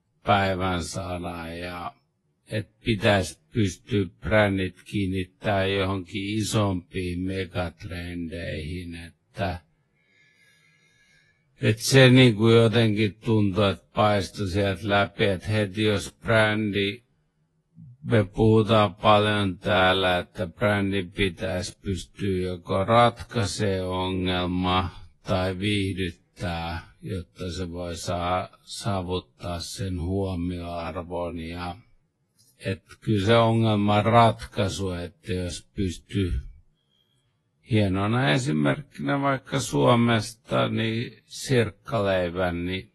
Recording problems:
wrong speed, natural pitch; too slow; 0.5 times normal speed
garbled, watery; slightly; nothing above 11.5 kHz

